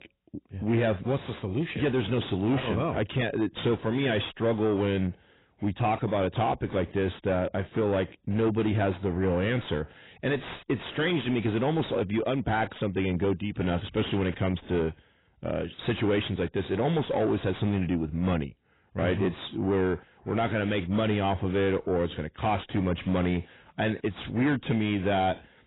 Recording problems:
garbled, watery; badly; nothing above 4 kHz
distortion; slight; 10 dB below the speech

